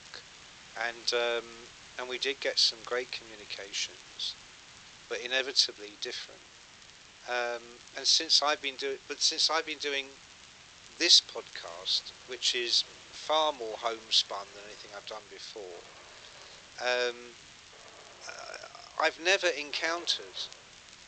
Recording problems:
thin; very; fading below 400 Hz
high frequencies cut off; noticeable; nothing above 8 kHz
background music; faint; throughout; 30 dB below the speech
hiss; faint; throughout; 20 dB below the speech
crackle, like an old record; faint; 30 dB below the speech

